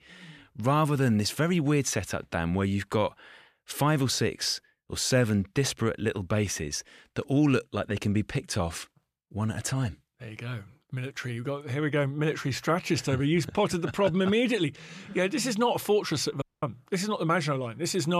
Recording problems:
audio cutting out; at 16 s
abrupt cut into speech; at the end

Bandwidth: 14.5 kHz